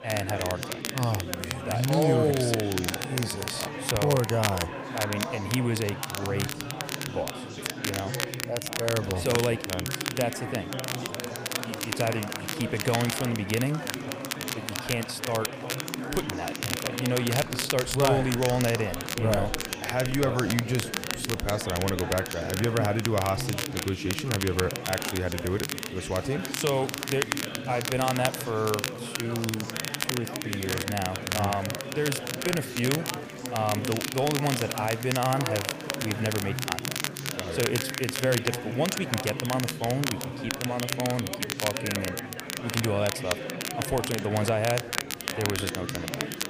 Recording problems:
chatter from many people; loud; throughout; 7 dB below the speech
crackle, like an old record; loud; 4 dB below the speech

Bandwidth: 15 kHz